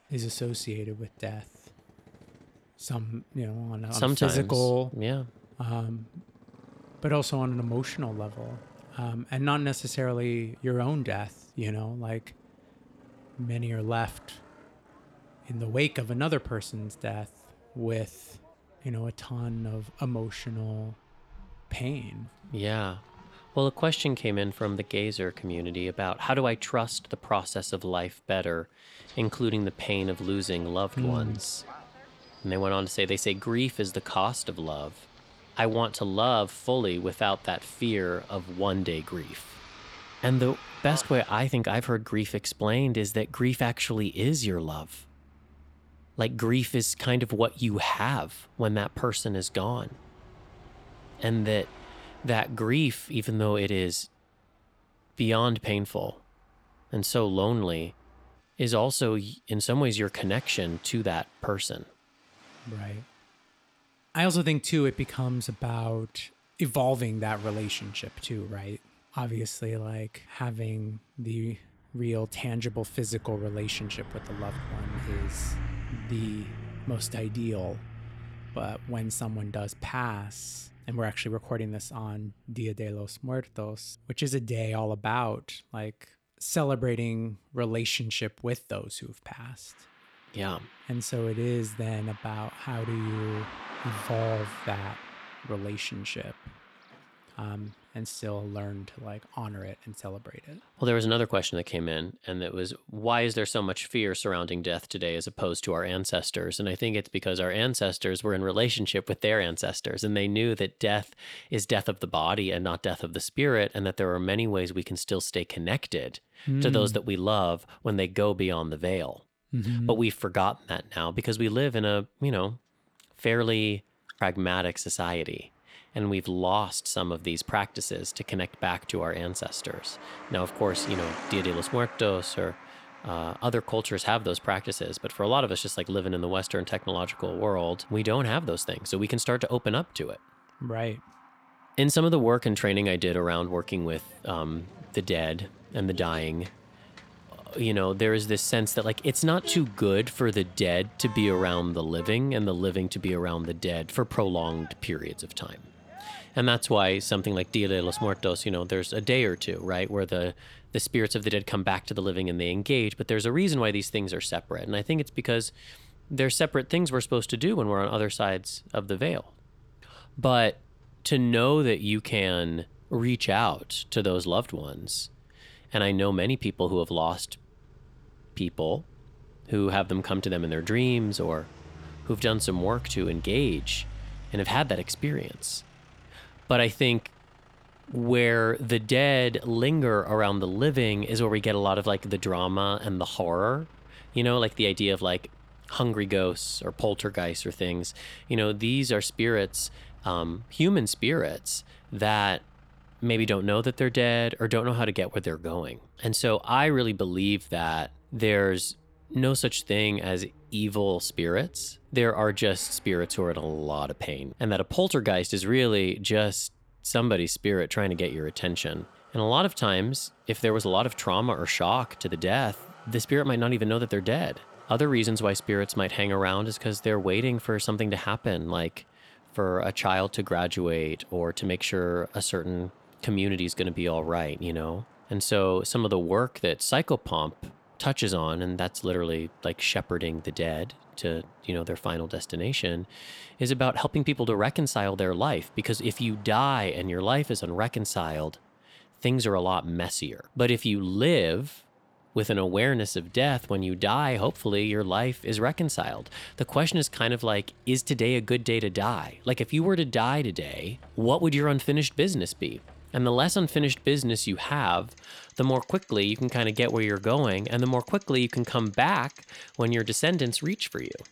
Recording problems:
traffic noise; faint; throughout; 20 dB below the speech

